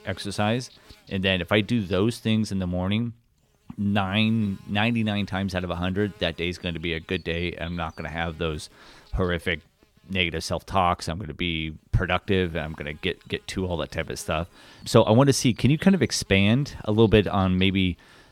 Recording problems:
electrical hum; faint; throughout; 50 Hz, 25 dB below the speech

